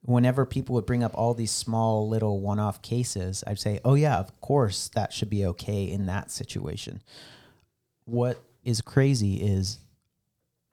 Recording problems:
none

